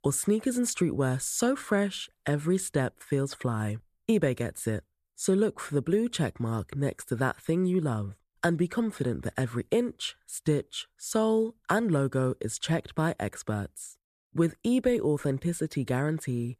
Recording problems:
none

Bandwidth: 14 kHz